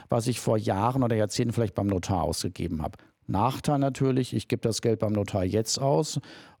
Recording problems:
none

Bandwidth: 18.5 kHz